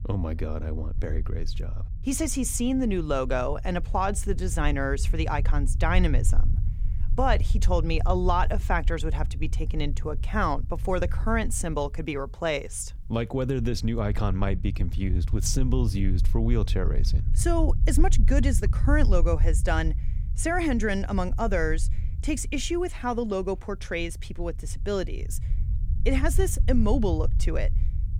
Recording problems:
low rumble; noticeable; throughout; 20 dB below the speech

